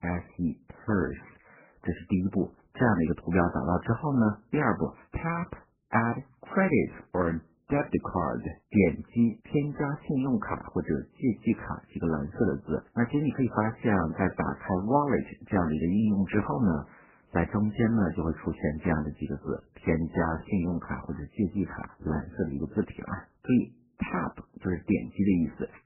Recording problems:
garbled, watery; badly; nothing above 2.5 kHz
muffled; very slightly; fading above 3 kHz

